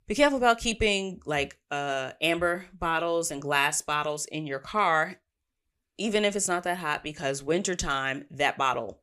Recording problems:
none

